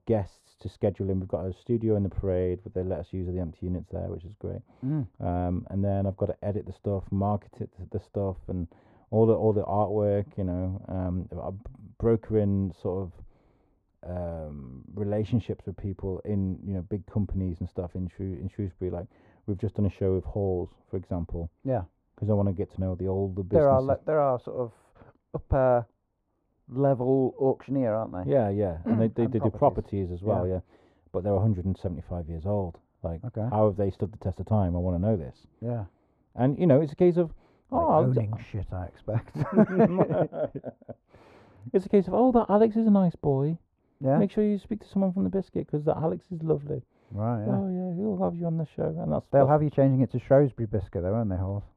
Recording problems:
muffled; very; fading above 2 kHz

